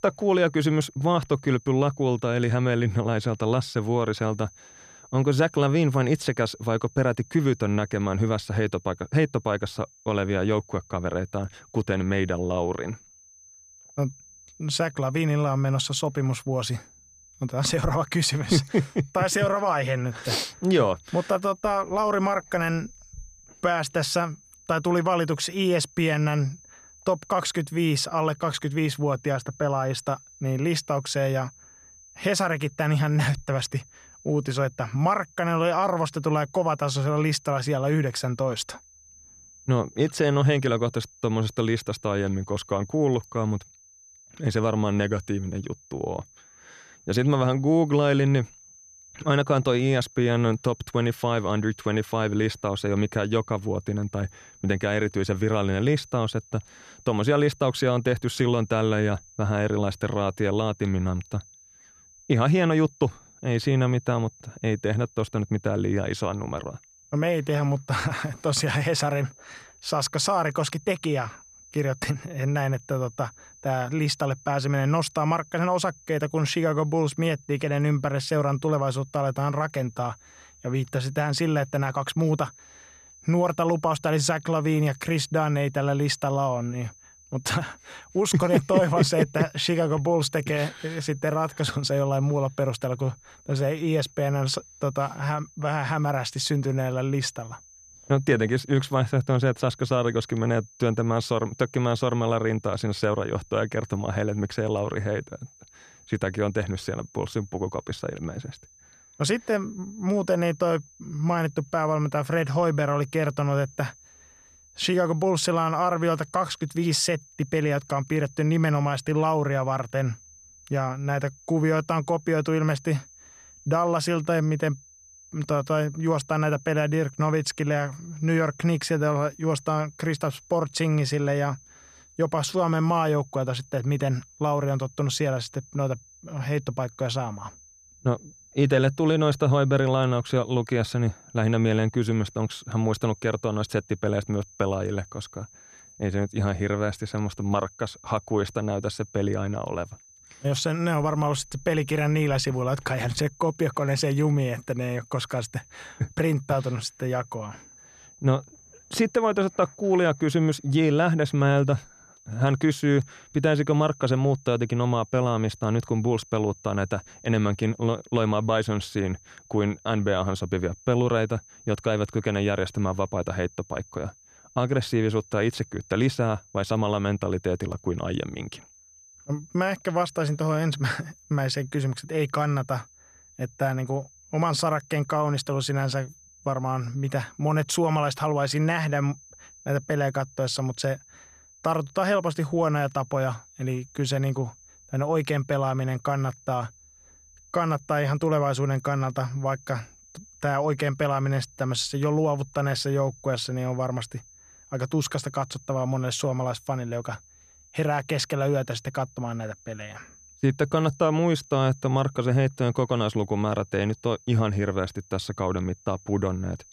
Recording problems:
high-pitched whine; faint; throughout; 6 kHz, 25 dB below the speech

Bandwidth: 14.5 kHz